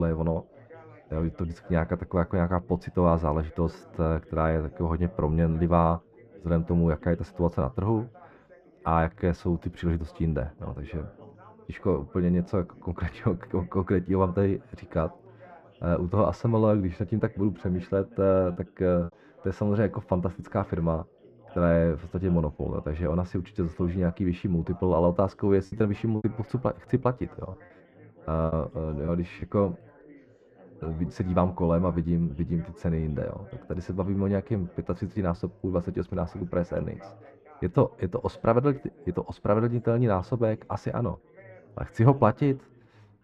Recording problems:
muffled; very; fading above 3.5 kHz
background chatter; faint; throughout; 4 voices, 25 dB below the speech
abrupt cut into speech; at the start
choppy; very; at 19 s and from 26 to 29 s; 5% of the speech affected

